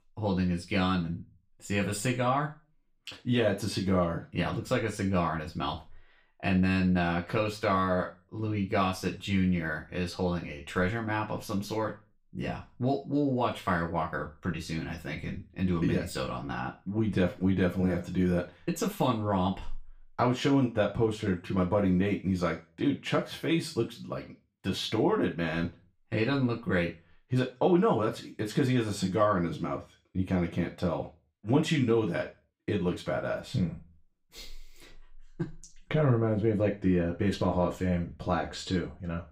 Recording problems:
off-mic speech; far
room echo; very slight; dies away in 0.3 s

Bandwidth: 15.5 kHz